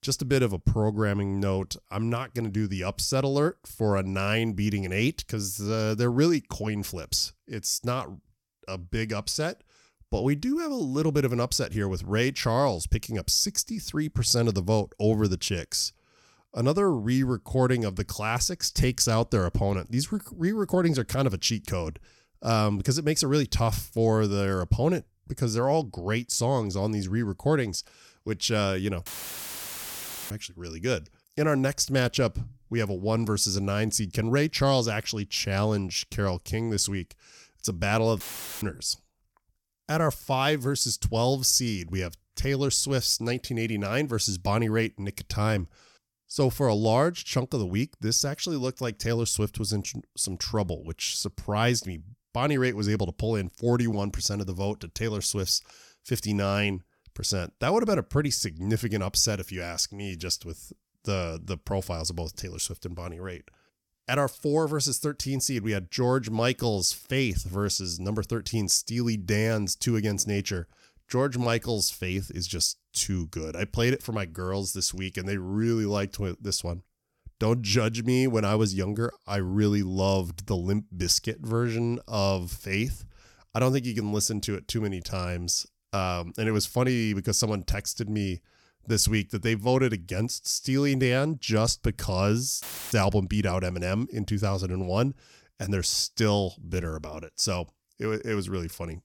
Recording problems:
audio cutting out; filled with static; at 29 s for 1 s, at 38 s and at 1:33

